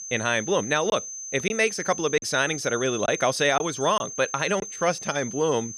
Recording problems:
high-pitched whine; loud; throughout; 6 kHz, 9 dB below the speech
choppy; occasionally; at 1 s and from 2 to 4.5 s; 5% of the speech affected

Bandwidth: 14.5 kHz